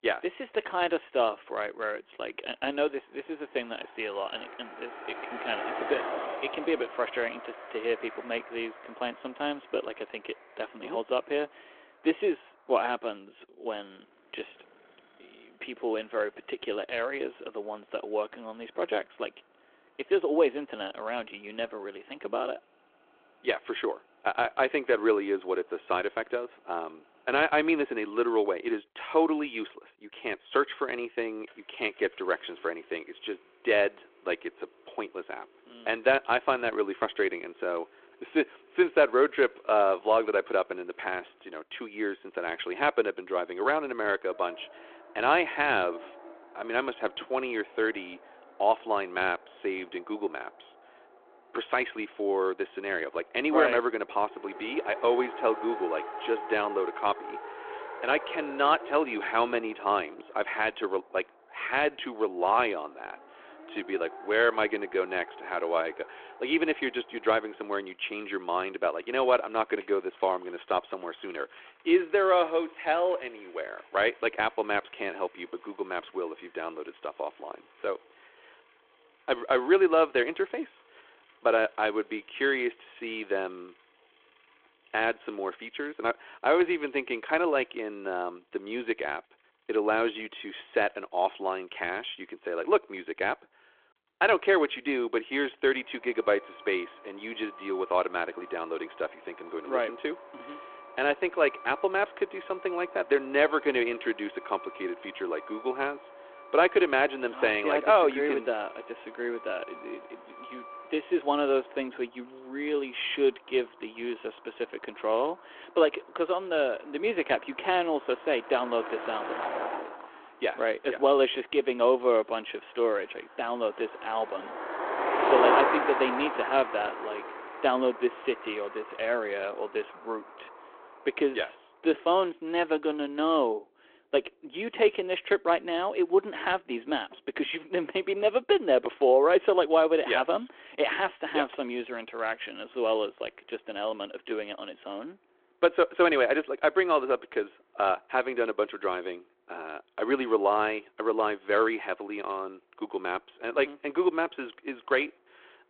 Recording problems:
phone-call audio
traffic noise; loud; throughout; 9 dB below the speech

